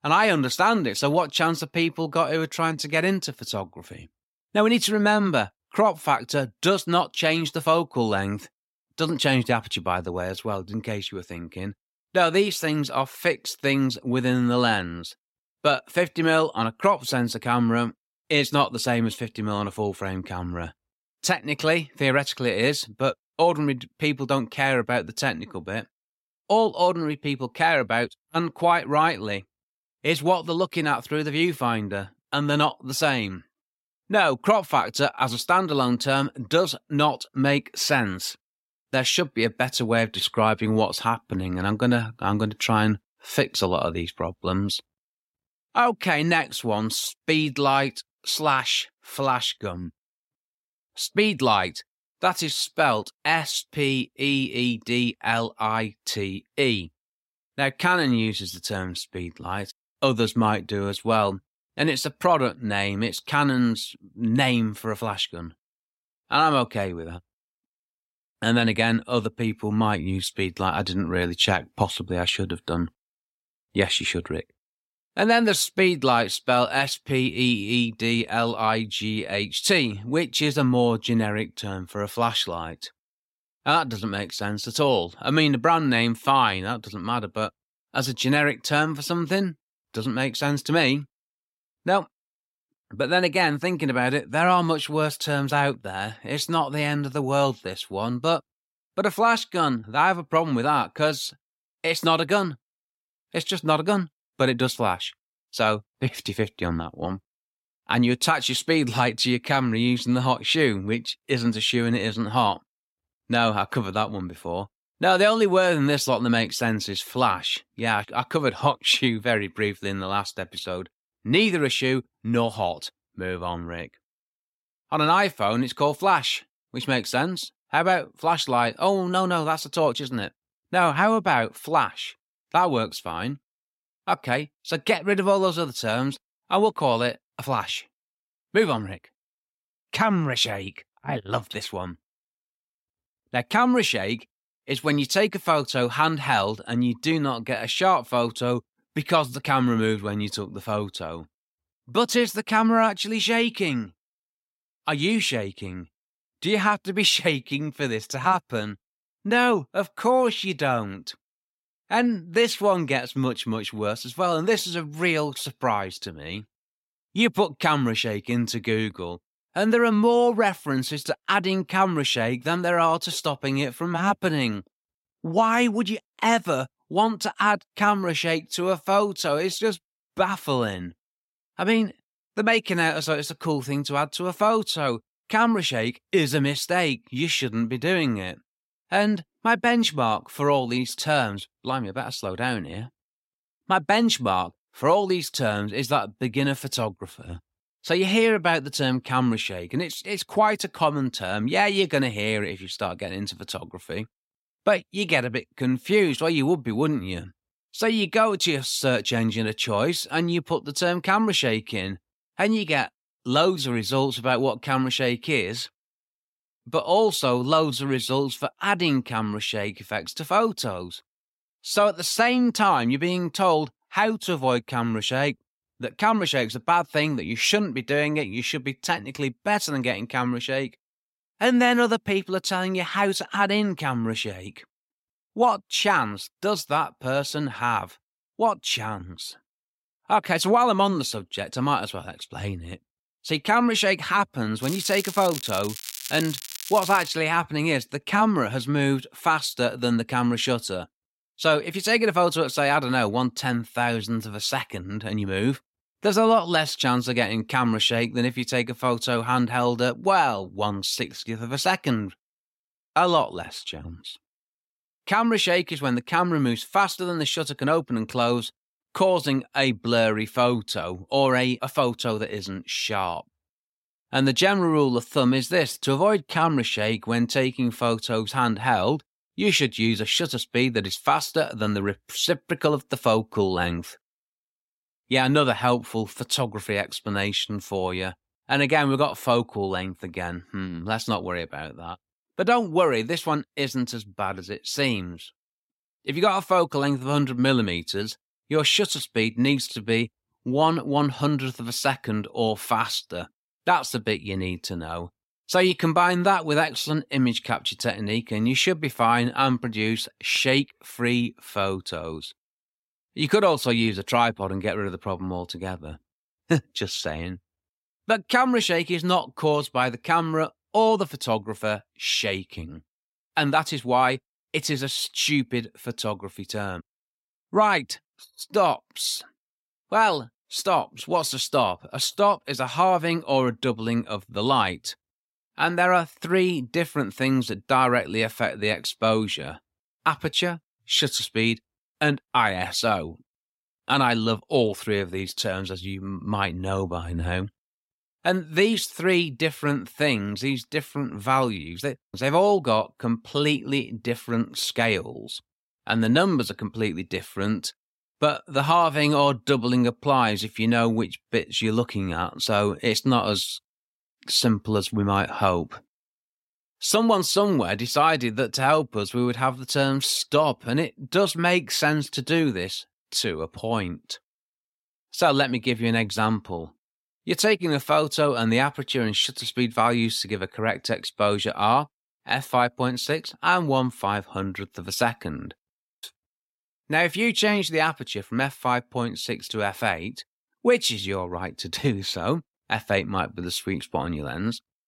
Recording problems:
crackling; noticeable; from 4:05 to 4:07; 10 dB below the speech

